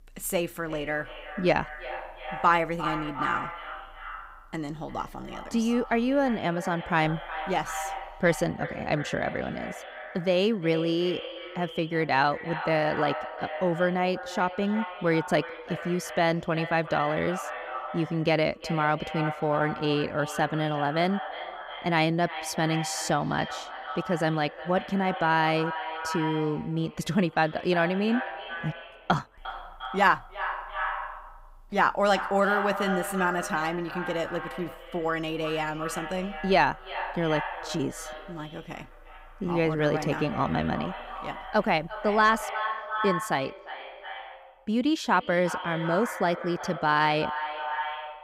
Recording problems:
echo of what is said; strong; throughout; 350 ms later, 9 dB below the speech

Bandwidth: 15.5 kHz